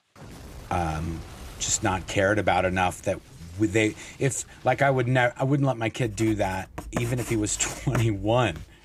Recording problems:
household noises; noticeable; throughout; 15 dB below the speech

